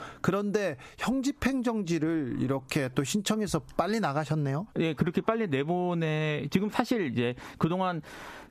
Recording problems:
squashed, flat; somewhat

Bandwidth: 14.5 kHz